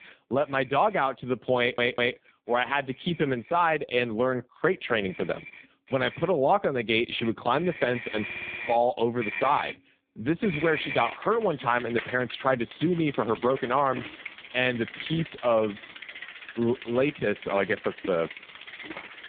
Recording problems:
phone-call audio; poor line
traffic noise; noticeable; throughout; 10 dB below the speech
audio stuttering; at 1.5 s and at 8 s

